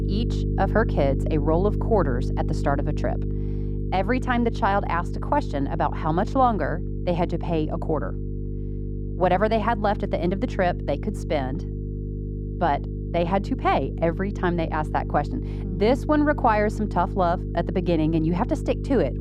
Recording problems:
muffled; very; fading above 2.5 kHz
electrical hum; noticeable; throughout; 50 Hz, 15 dB below the speech

